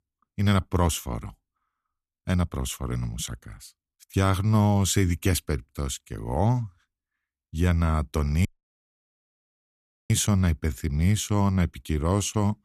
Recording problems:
audio cutting out; at 8.5 s for 1.5 s

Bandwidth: 14 kHz